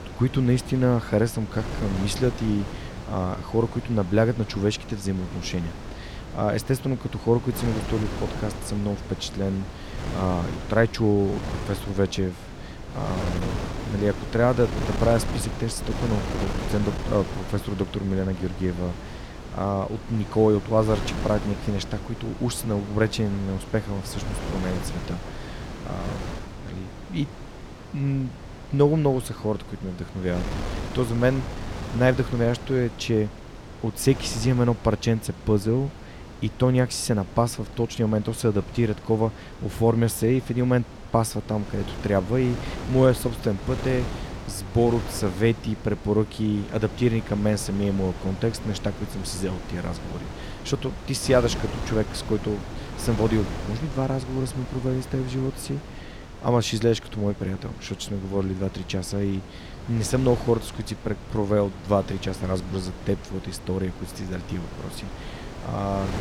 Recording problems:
wind noise on the microphone; occasional gusts; 10 dB below the speech

